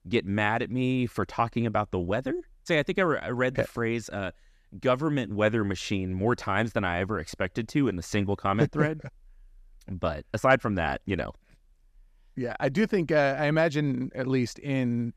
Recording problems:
none

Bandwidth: 14.5 kHz